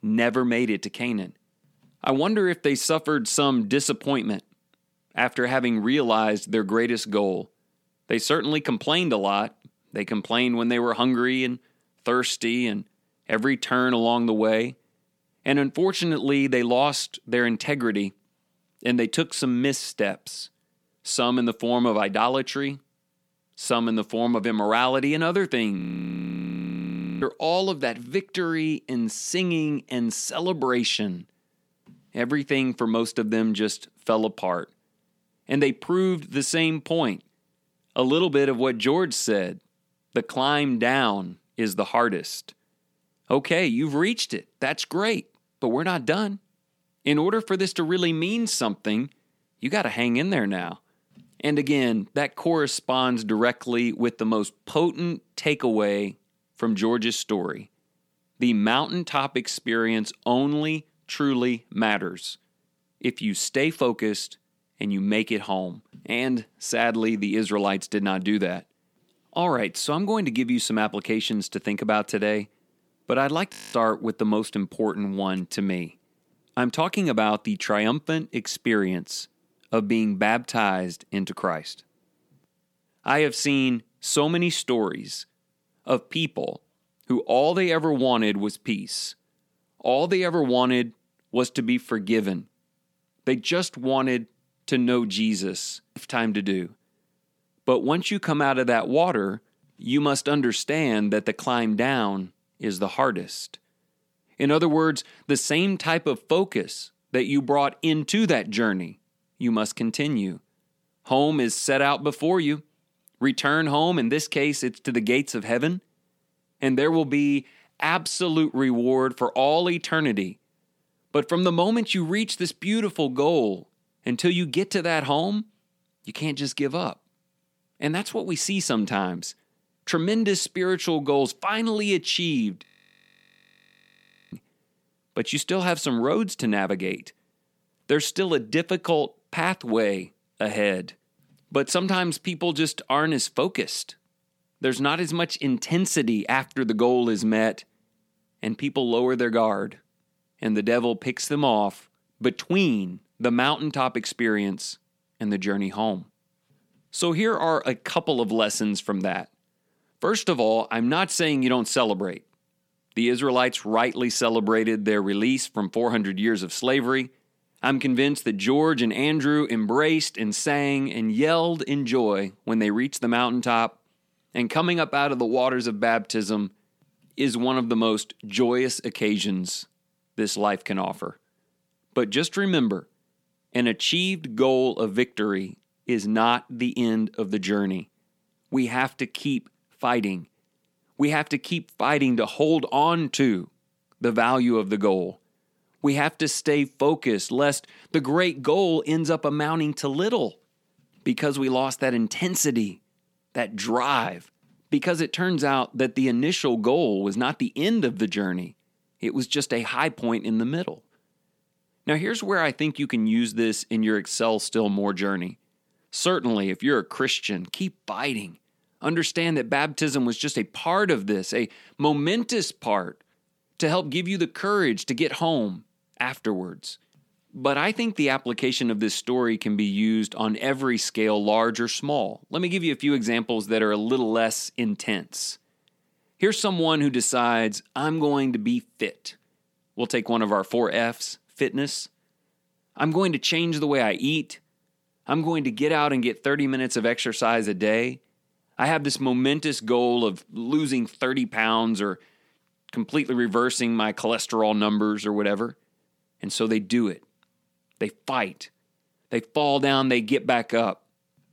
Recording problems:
audio freezing; at 26 s for 1.5 s, at 1:14 and at 2:13 for 1.5 s

